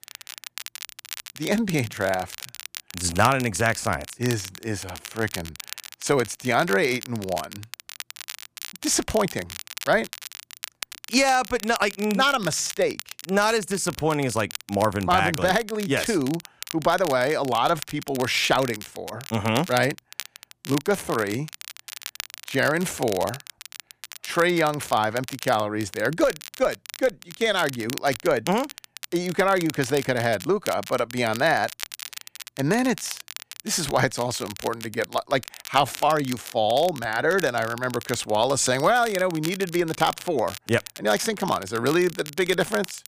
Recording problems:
crackle, like an old record; noticeable; 15 dB below the speech

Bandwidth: 15 kHz